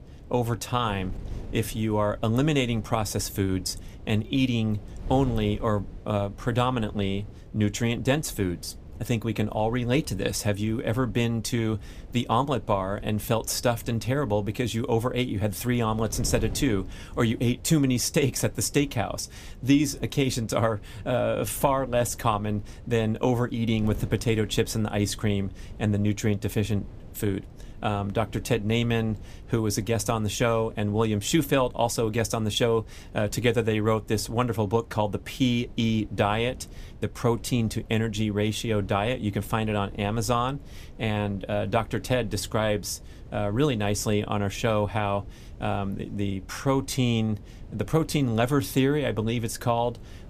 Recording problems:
wind noise on the microphone; occasional gusts; 25 dB below the speech

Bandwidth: 15 kHz